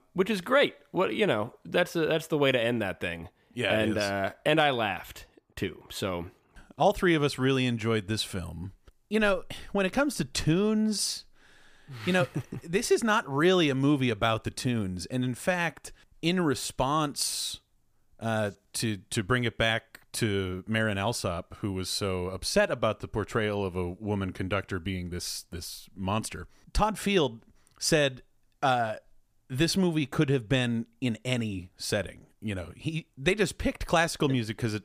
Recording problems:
none

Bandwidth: 15 kHz